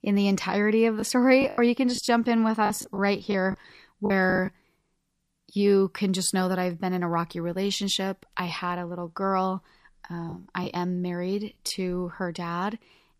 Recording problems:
choppy; very; from 1 to 4.5 s; 10% of the speech affected

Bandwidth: 14.5 kHz